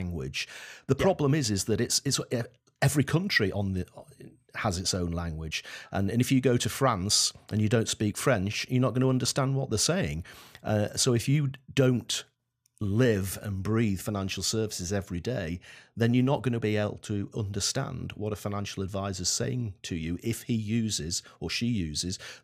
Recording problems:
abrupt cut into speech; at the start

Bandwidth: 15 kHz